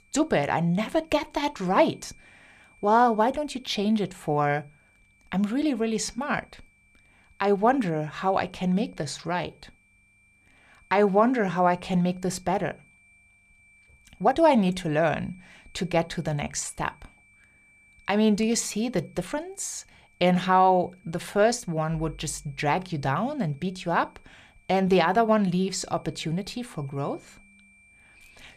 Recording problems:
high-pitched whine; faint; throughout; 2.5 kHz, 30 dB below the speech
uneven, jittery; slightly; from 1 to 21 s

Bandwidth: 15 kHz